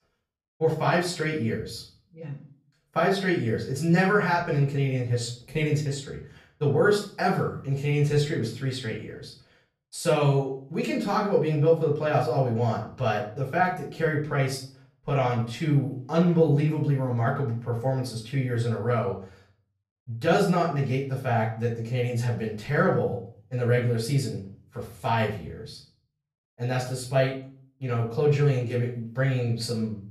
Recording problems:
off-mic speech; far
room echo; slight; dies away in 0.4 s

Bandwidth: 15 kHz